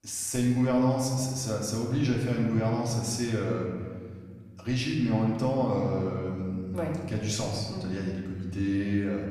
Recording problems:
off-mic speech; far
room echo; noticeable; dies away in 1.8 s

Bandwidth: 14.5 kHz